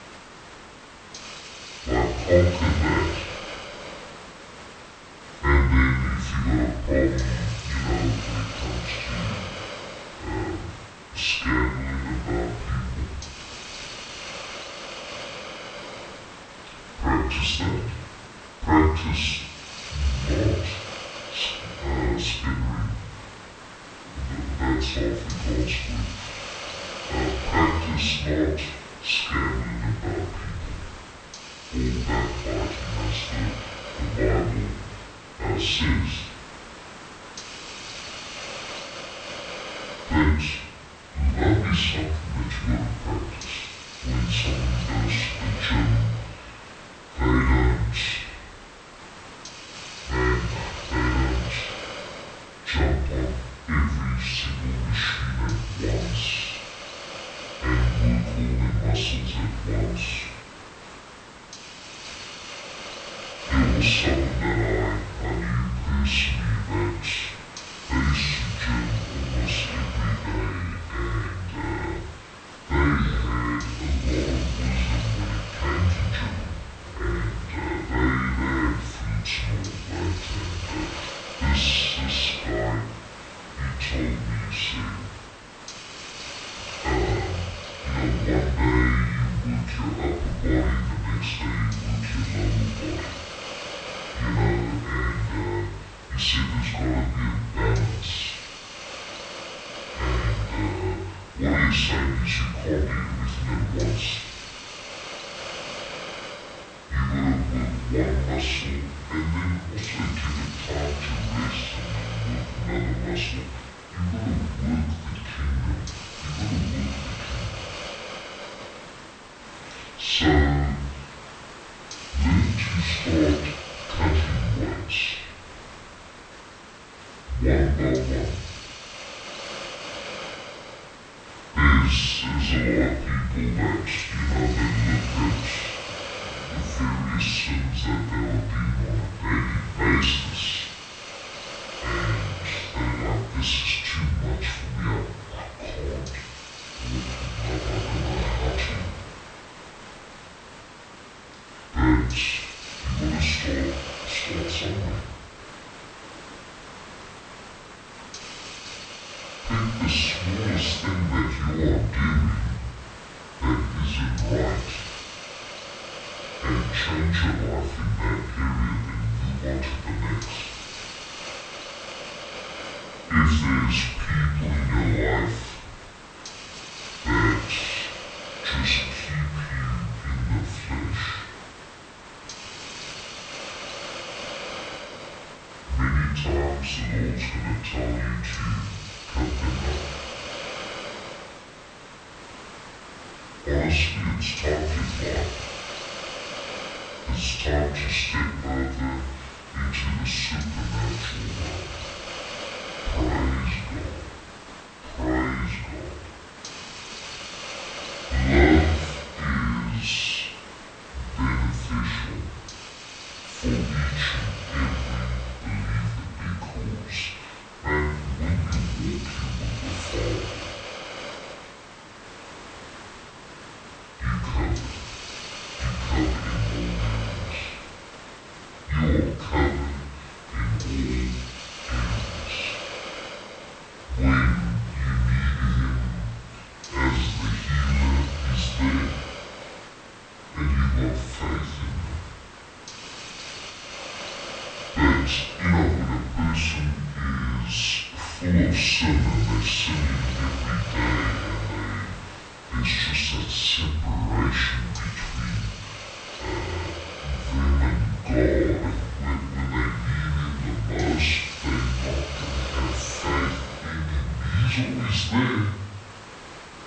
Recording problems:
off-mic speech; far
wrong speed and pitch; too slow and too low; 0.6 times normal speed
room echo; noticeable; dies away in 0.6 s
hiss; noticeable; throughout; 10 dB below the speech

